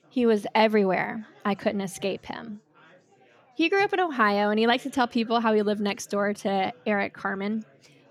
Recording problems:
background chatter; faint; throughout; 4 voices, 30 dB below the speech

